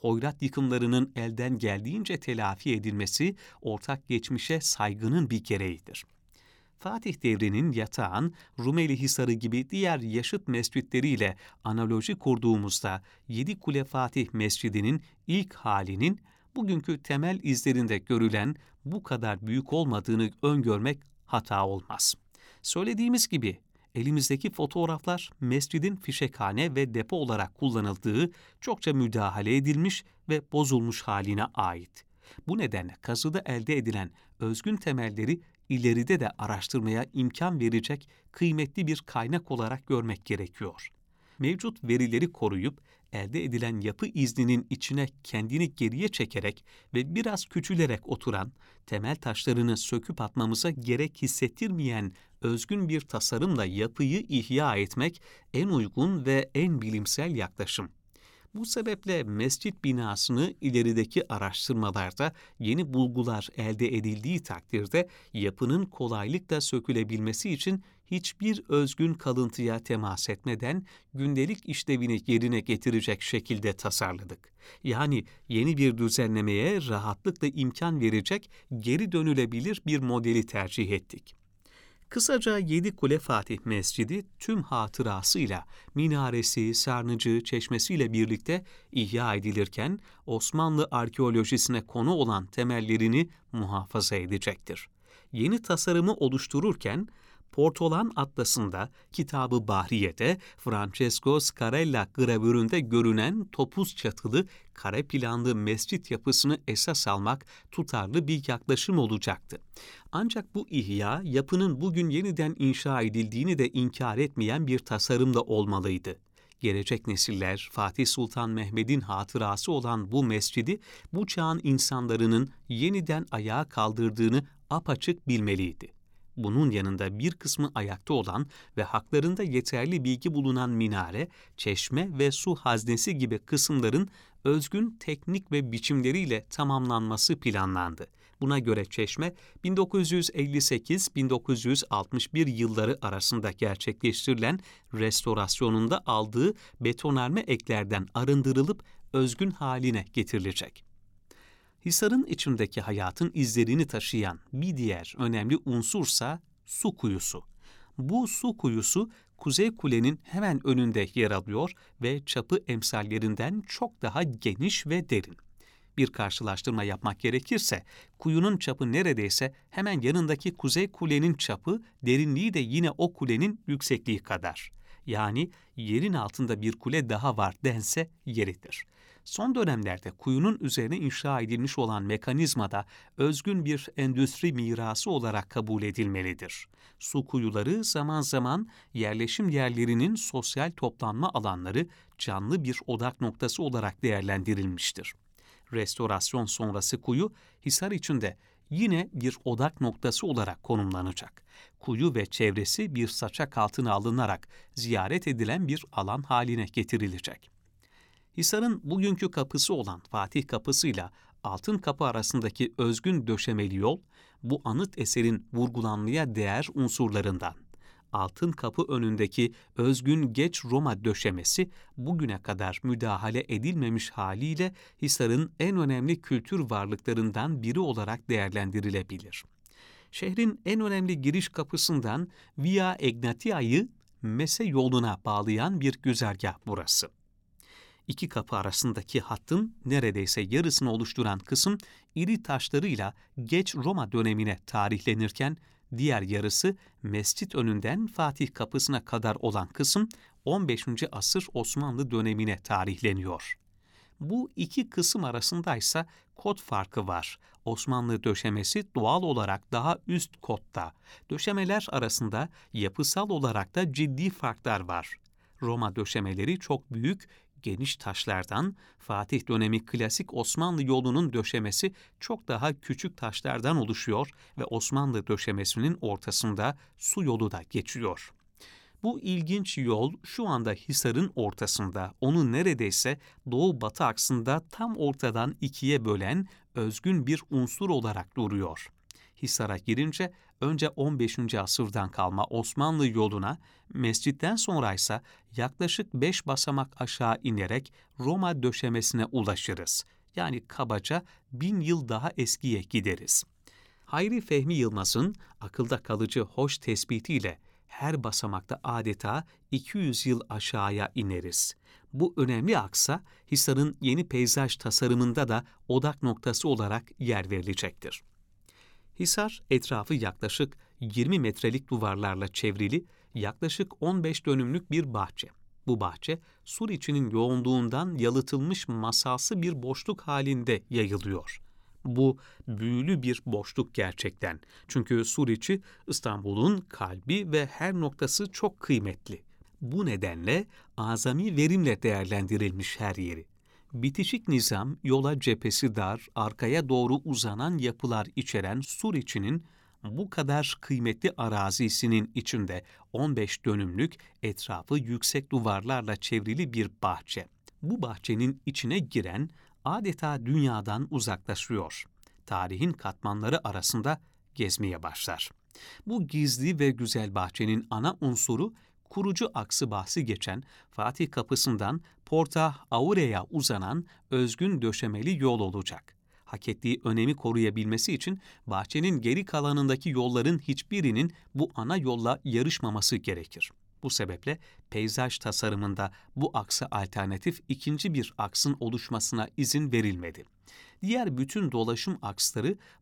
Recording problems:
none

